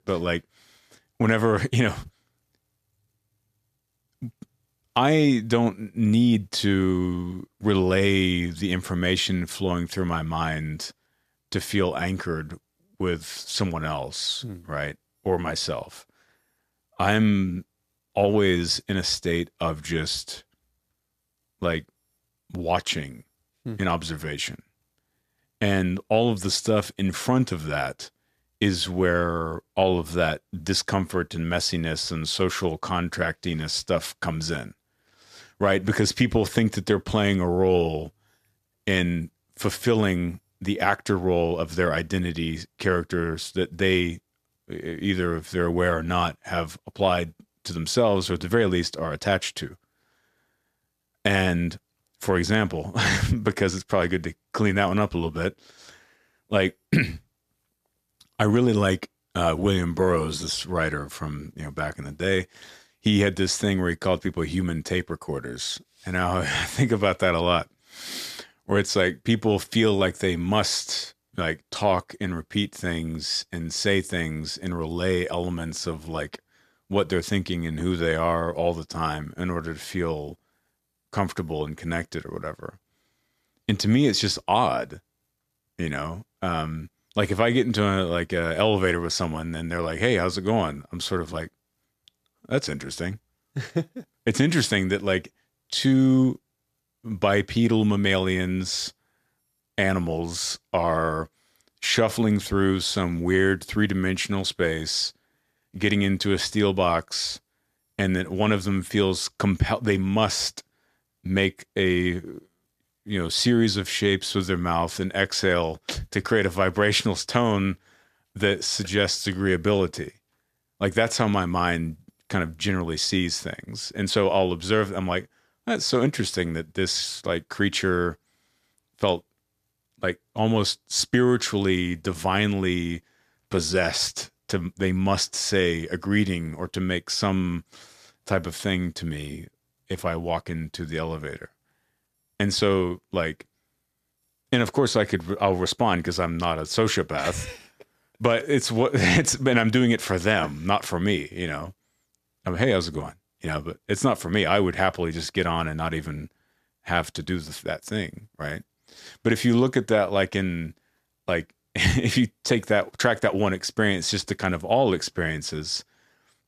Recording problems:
none

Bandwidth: 14.5 kHz